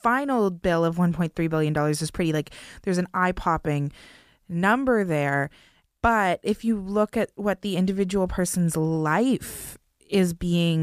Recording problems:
abrupt cut into speech; at the end

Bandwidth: 15 kHz